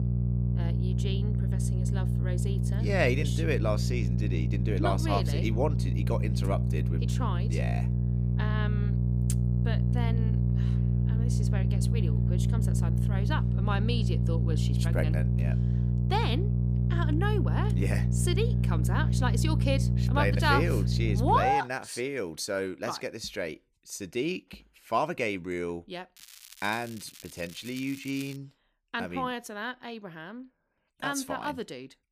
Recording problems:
electrical hum; loud; until 21 s; 60 Hz, 7 dB below the speech
crackling; noticeable; from 26 to 28 s; 15 dB below the speech

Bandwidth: 15 kHz